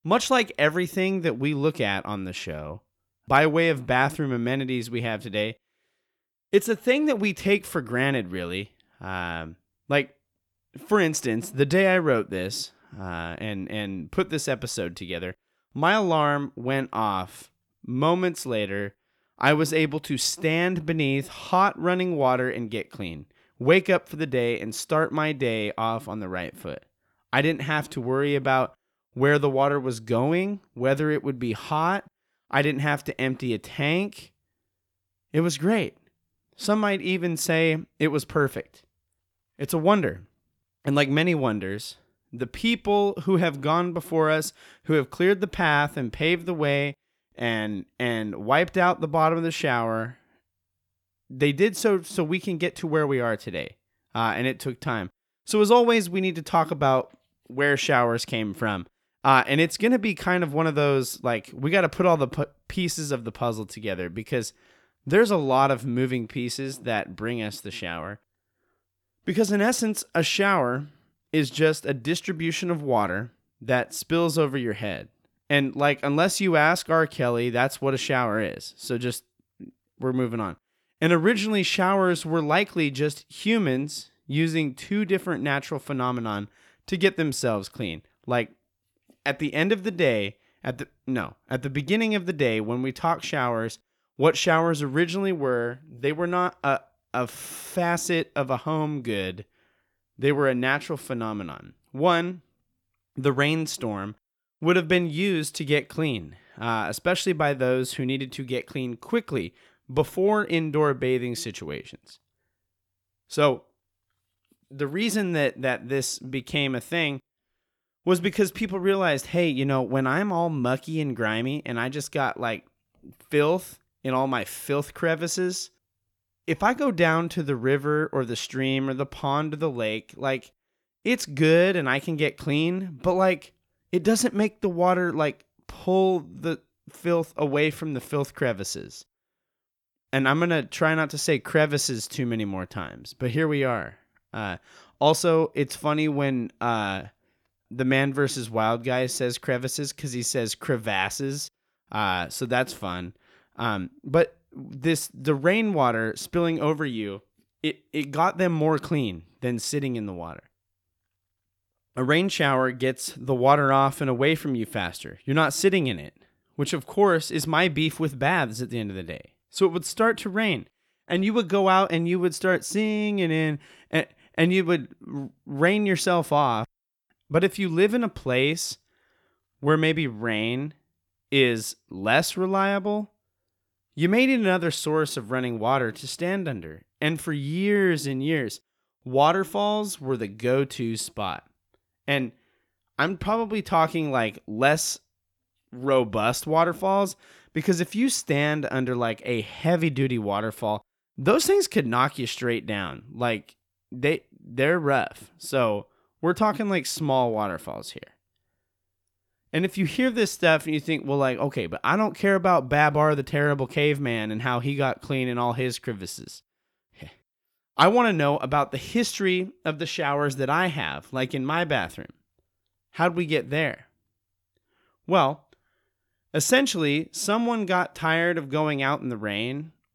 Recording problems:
none

